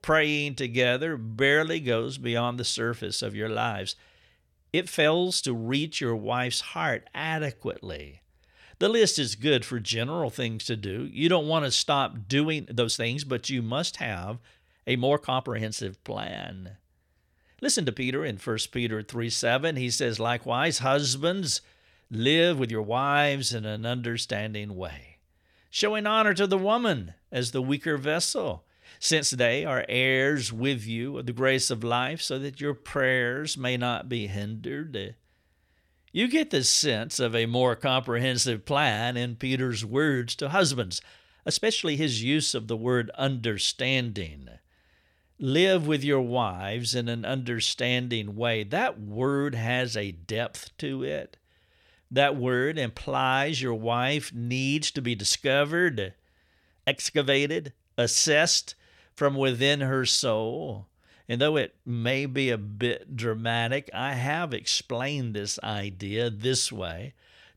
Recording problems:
uneven, jittery; strongly; from 4.5 s to 1:05

